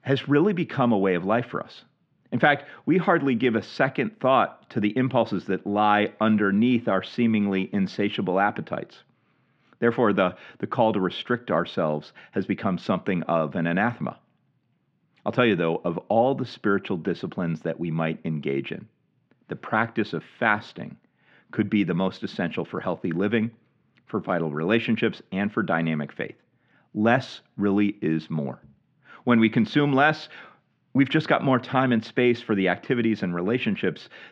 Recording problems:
muffled; slightly; fading above 3 kHz

